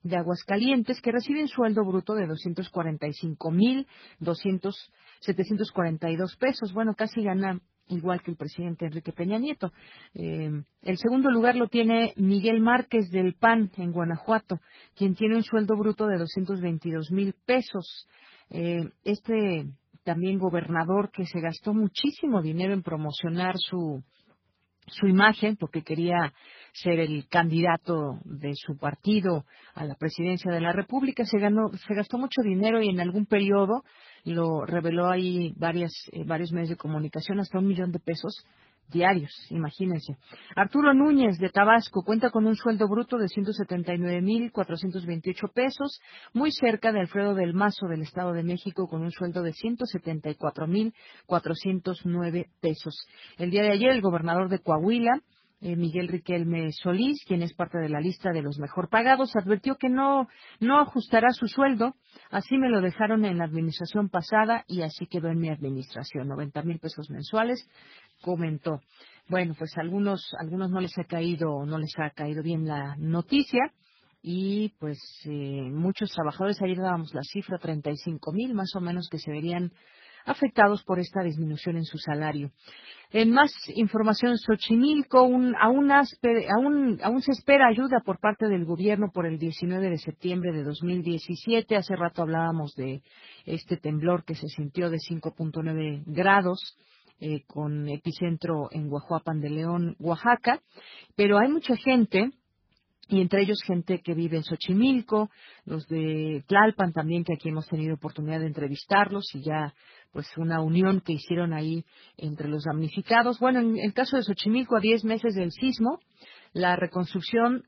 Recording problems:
garbled, watery; badly; nothing above 5 kHz

